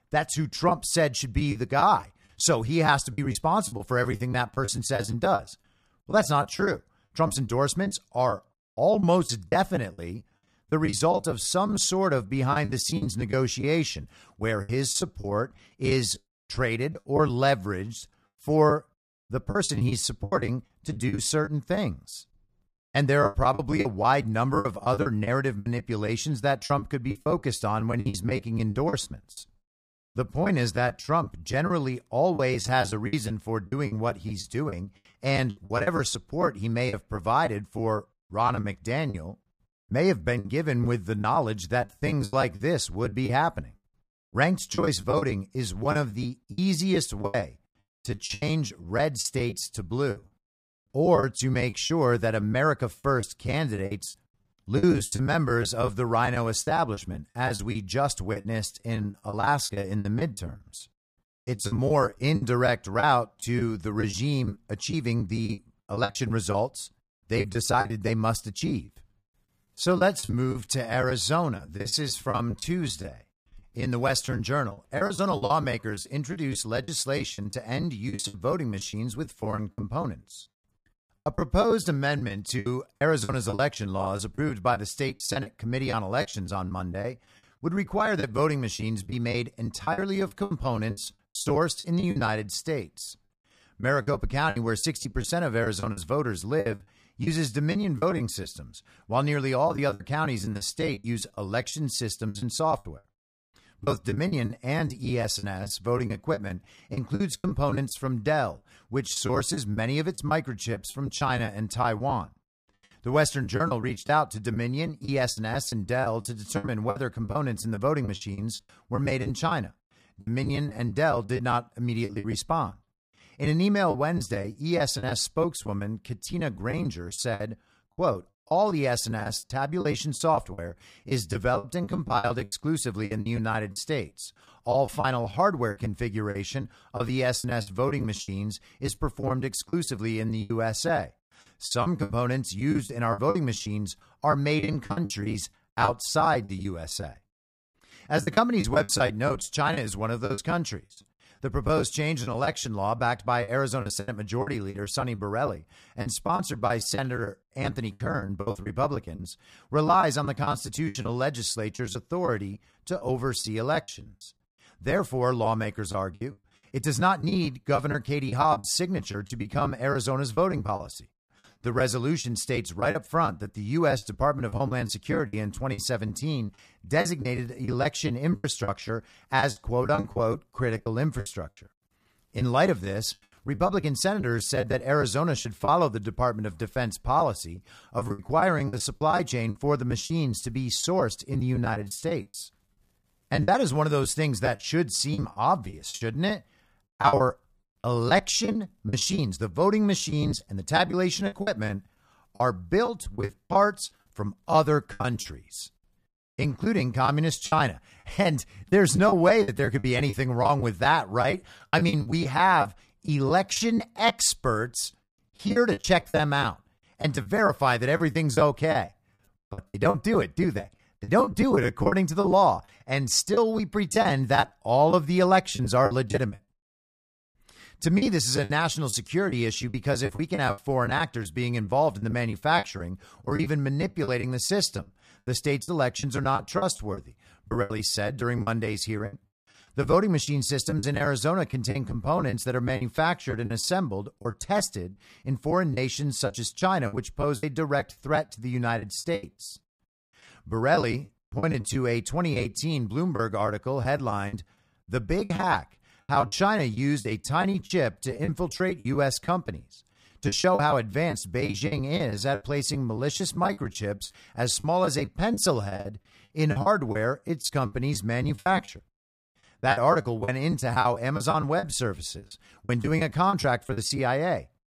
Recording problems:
choppy; very; 14% of the speech affected

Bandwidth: 14.5 kHz